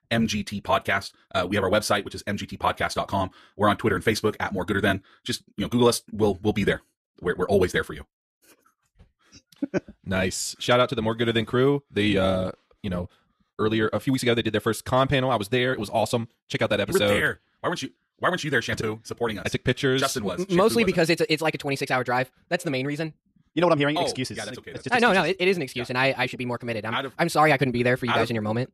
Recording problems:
wrong speed, natural pitch; too fast; 1.7 times normal speed

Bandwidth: 14 kHz